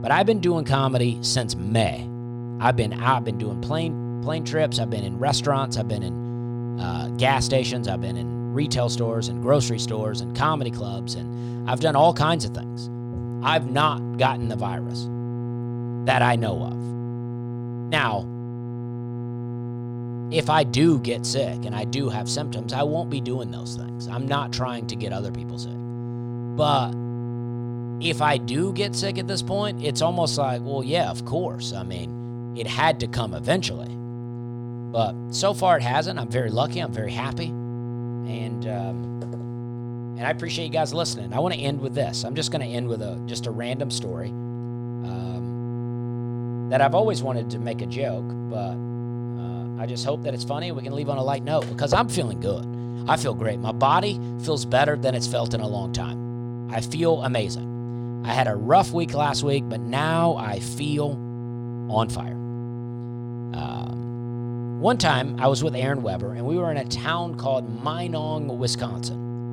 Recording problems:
electrical hum; noticeable; throughout; 60 Hz, 15 dB below the speech

